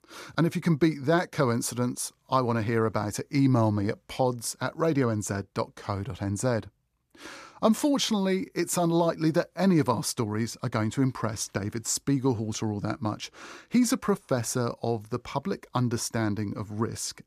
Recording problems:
none

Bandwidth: 14.5 kHz